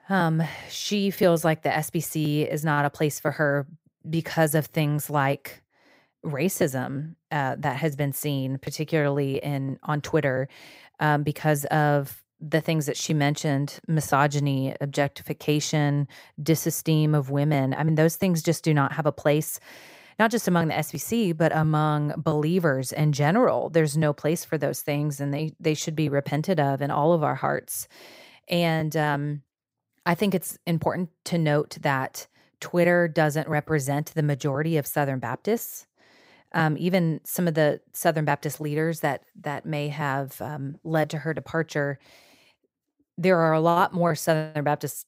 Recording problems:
none

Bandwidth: 15.5 kHz